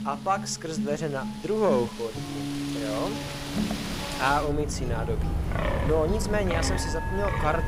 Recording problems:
background music; loud; throughout; 6 dB below the speech
wind in the background; loud; throughout; 3 dB below the speech
high-pitched whine; faint; throughout; 3 kHz, 35 dB below the speech

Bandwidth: 15.5 kHz